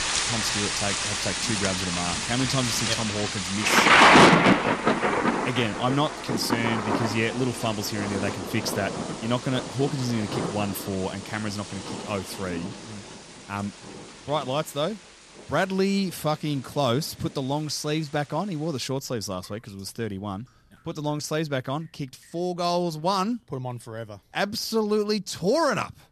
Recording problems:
rain or running water; very loud; throughout; 5 dB above the speech

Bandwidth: 13.5 kHz